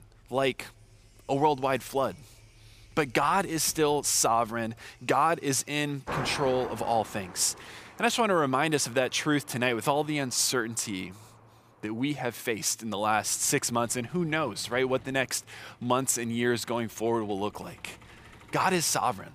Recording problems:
traffic noise; noticeable; throughout; 20 dB below the speech

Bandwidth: 15 kHz